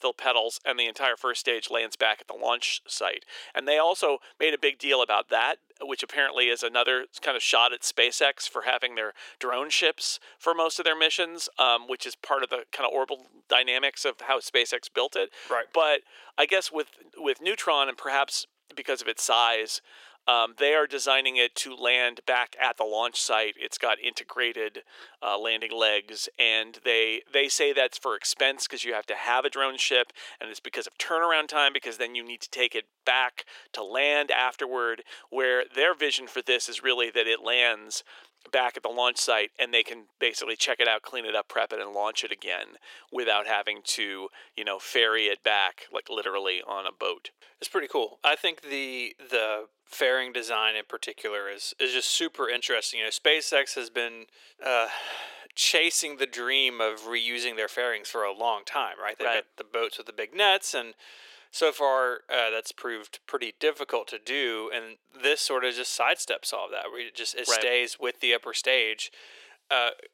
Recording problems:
thin; very; fading below 400 Hz

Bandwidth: 16 kHz